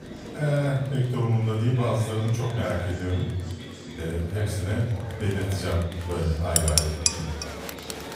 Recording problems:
off-mic speech; far
room echo; noticeable; dies away in 0.7 s
murmuring crowd; noticeable; throughout; 10 dB below the speech
background music; very faint; throughout; 25 dB below the speech
clattering dishes; loud; at 6.5 s; peak 5 dB above the speech

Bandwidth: 15.5 kHz